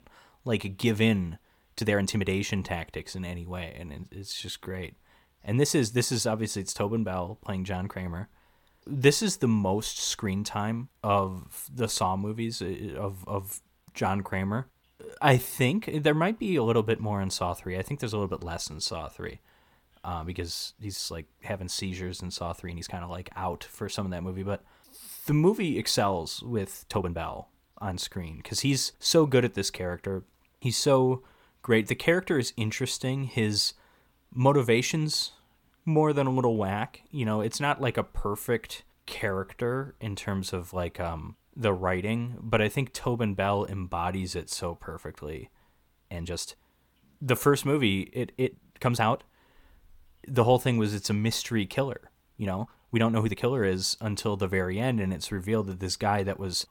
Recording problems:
uneven, jittery; strongly; from 2 to 53 s

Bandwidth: 17 kHz